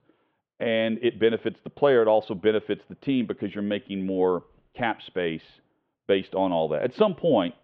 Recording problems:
muffled; very; fading above 3 kHz

